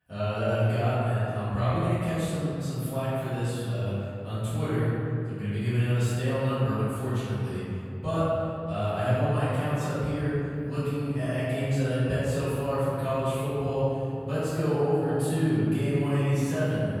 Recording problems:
room echo; strong; dies away in 2.7 s
off-mic speech; far

